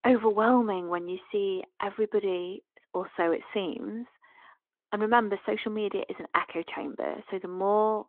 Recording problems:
phone-call audio

